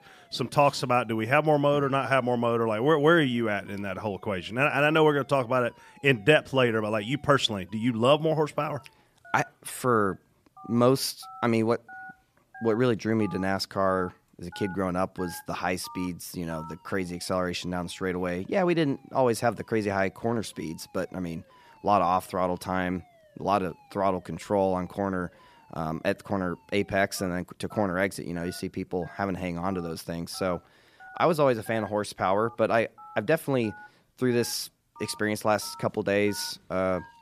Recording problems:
alarms or sirens; faint; throughout; 25 dB below the speech

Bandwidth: 14.5 kHz